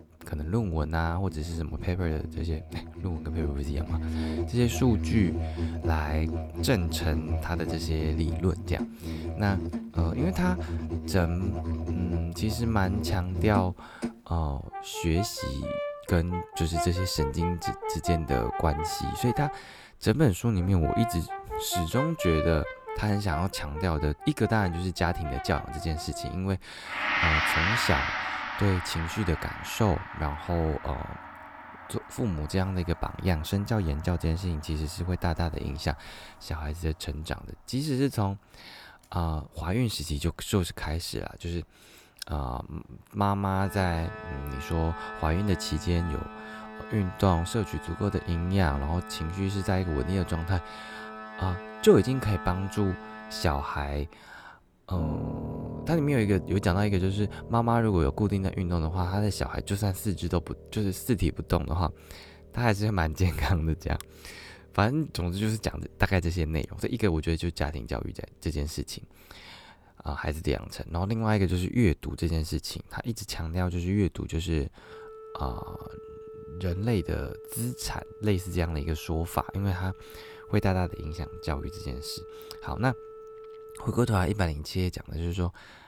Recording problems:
background music; loud; throughout; 6 dB below the speech

